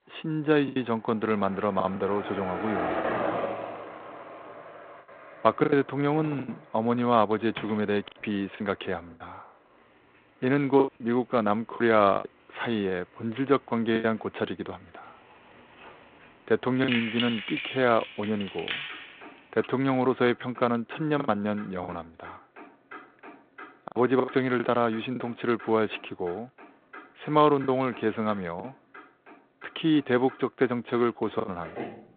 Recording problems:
phone-call audio; nothing above 3.5 kHz
traffic noise; noticeable; throughout; 15 dB below the speech
choppy; very; 6% of the speech affected
door banging; faint; from 3.5 to 8 s; peak 15 dB below the speech
jangling keys; noticeable; from 17 to 20 s; peak 2 dB below the speech

